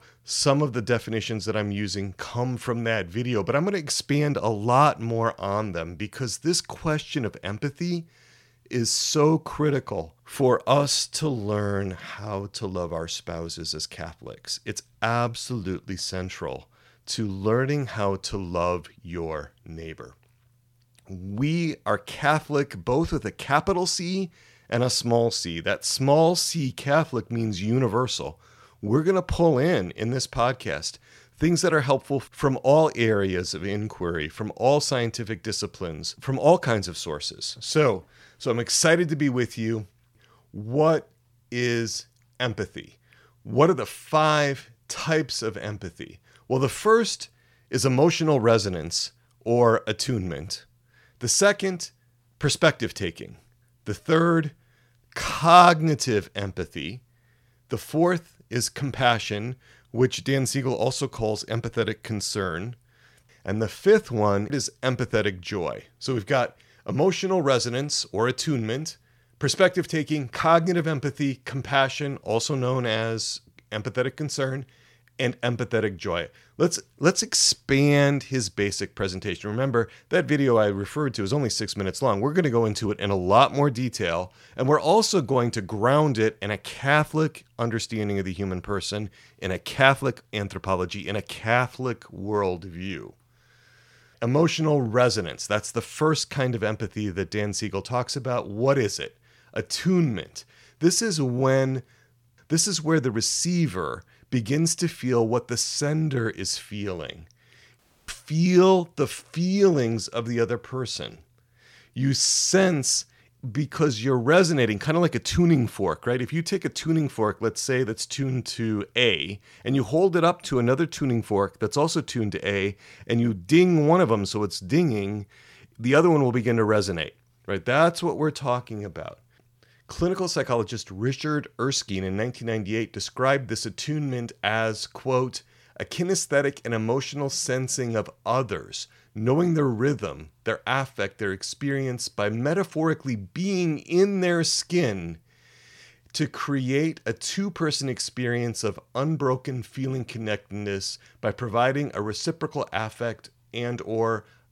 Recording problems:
audio cutting out; at 1:48

